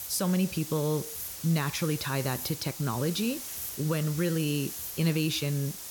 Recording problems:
hiss; loud; throughout; 7 dB below the speech

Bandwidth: 18 kHz